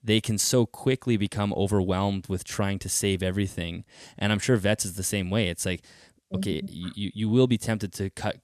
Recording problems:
none

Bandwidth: 14 kHz